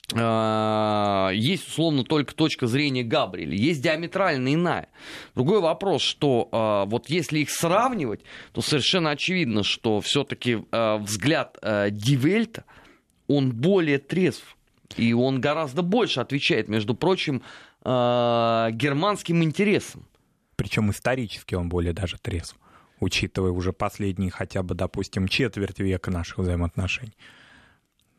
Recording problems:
none

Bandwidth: 13.5 kHz